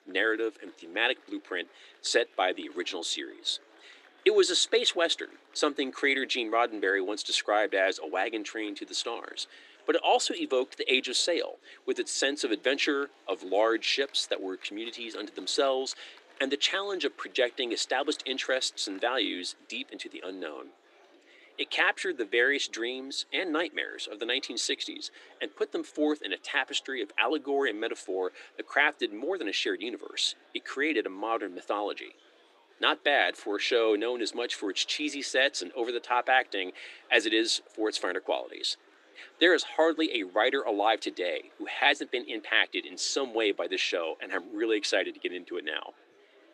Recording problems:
thin; somewhat; fading below 300 Hz
murmuring crowd; faint; throughout; 30 dB below the speech

